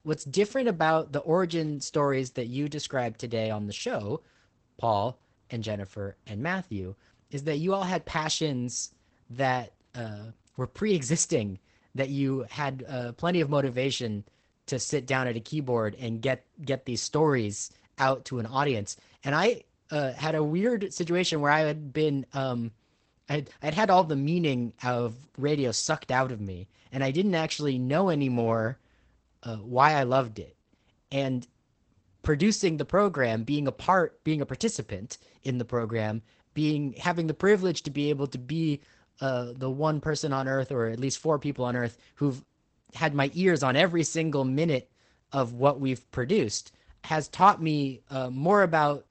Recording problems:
garbled, watery; badly; nothing above 8 kHz

